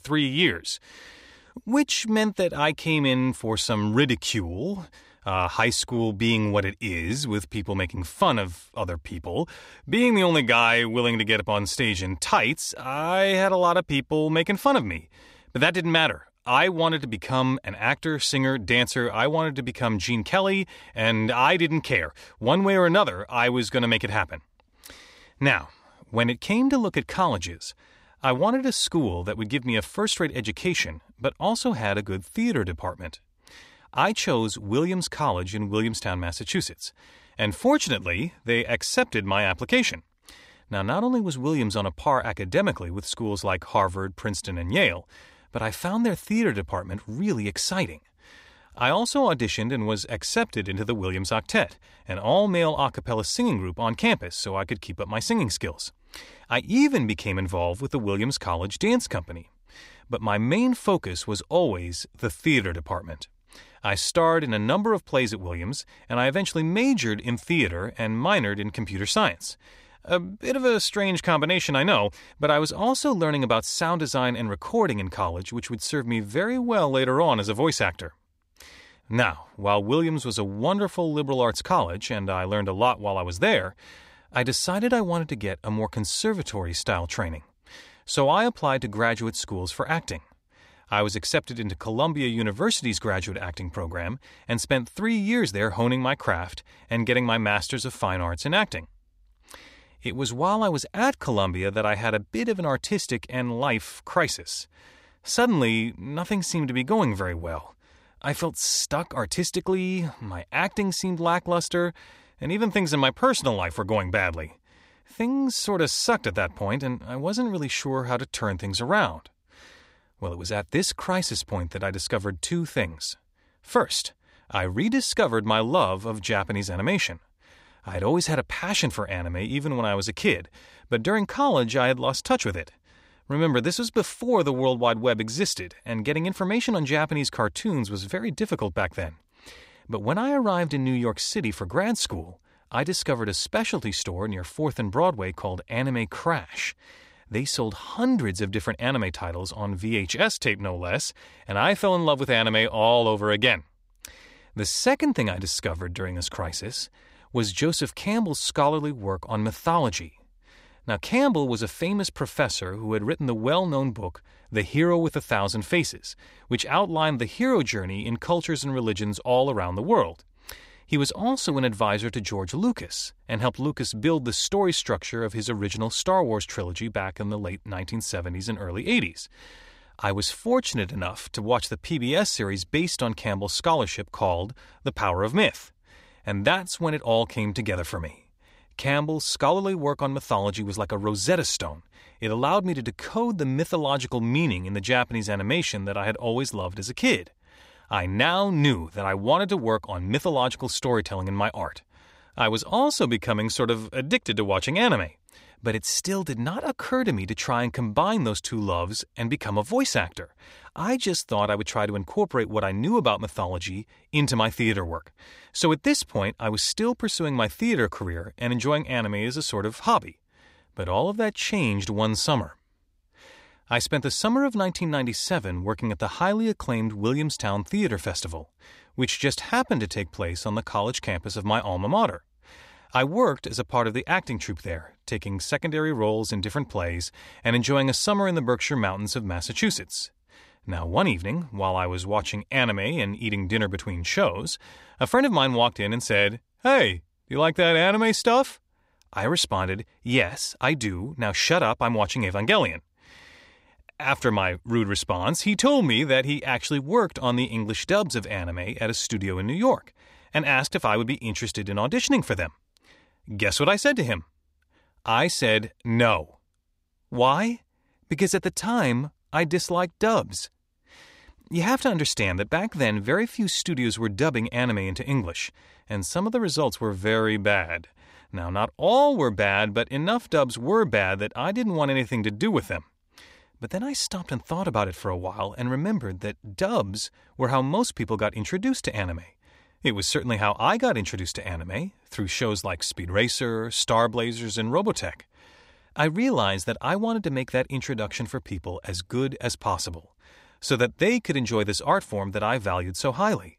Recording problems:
none

